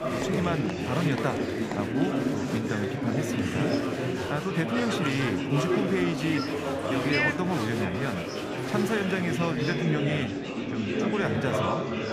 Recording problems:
murmuring crowd; very loud; throughout; 2 dB above the speech

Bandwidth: 15 kHz